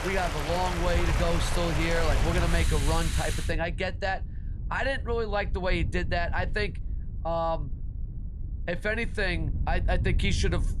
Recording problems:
rain or running water; loud; until 3.5 s; 3 dB below the speech
wind noise on the microphone; occasional gusts; 20 dB below the speech

